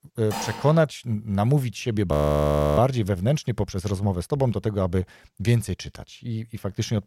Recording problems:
clattering dishes; noticeable; at 0.5 s; peak 8 dB below the speech
audio freezing; at 2 s for 0.5 s

